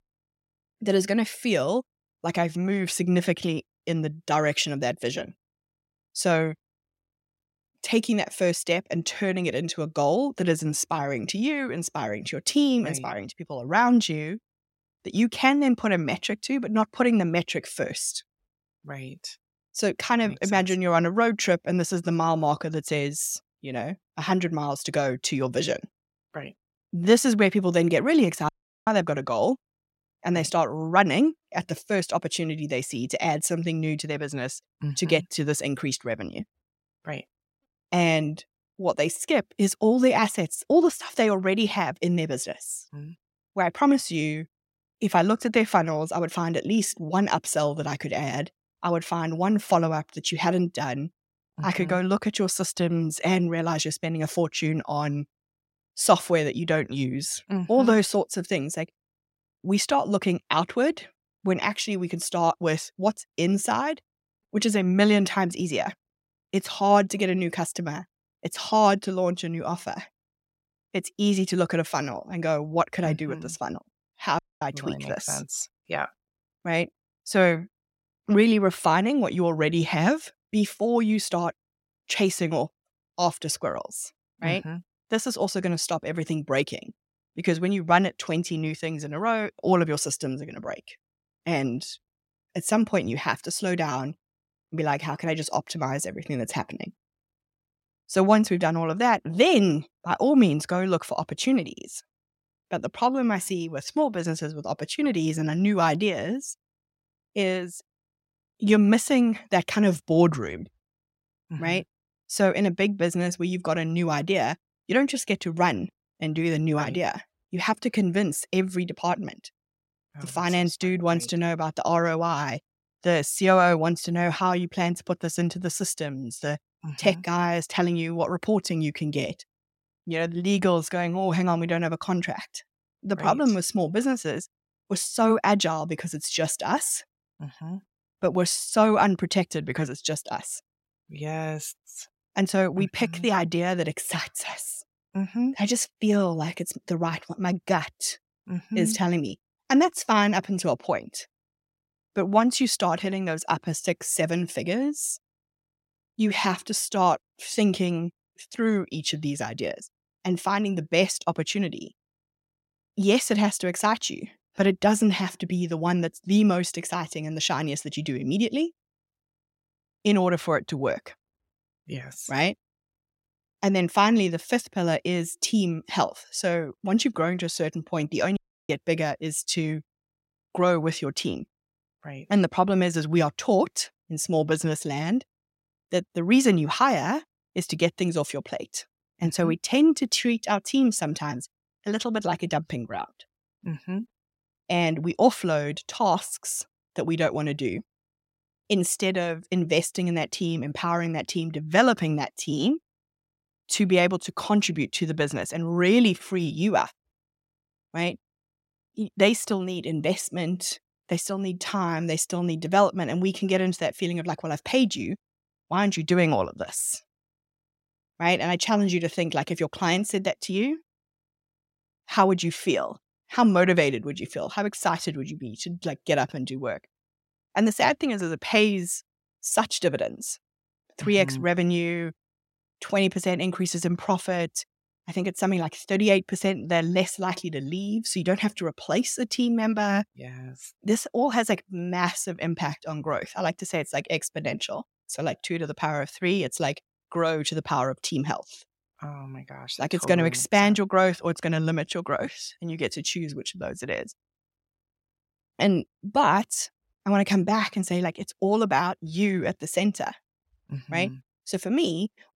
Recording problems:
audio cutting out; at 28 s, at 1:14 and at 2:58

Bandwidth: 16 kHz